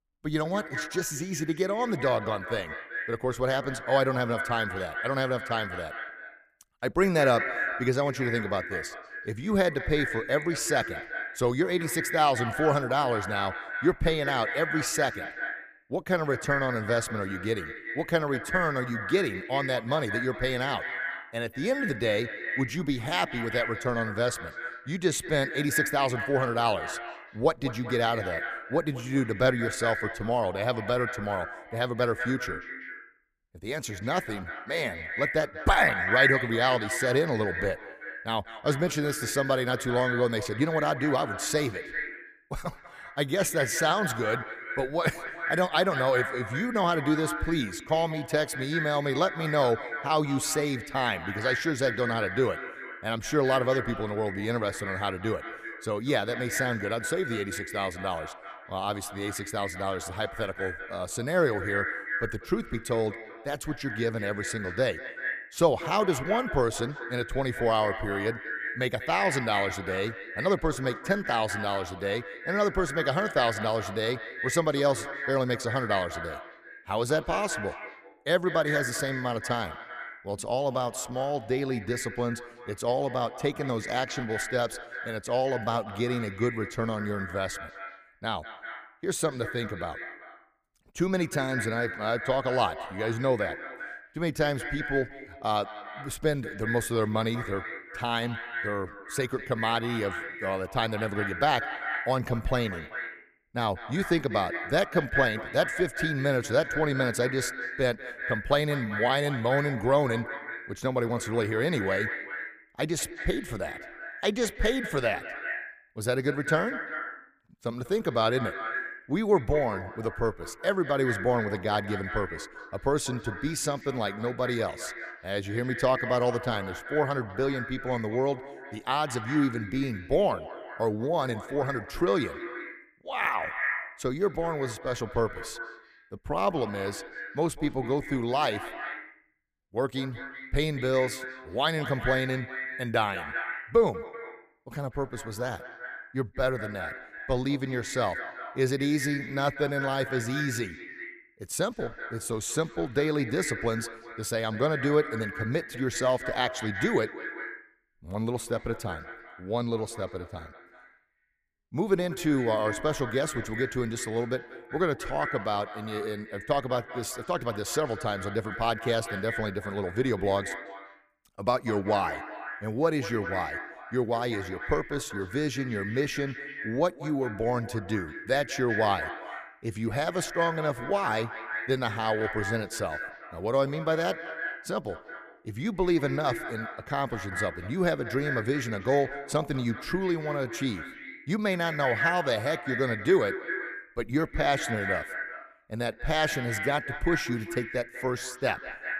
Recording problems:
echo of what is said; strong; throughout; 190 ms later, 7 dB below the speech

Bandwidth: 15 kHz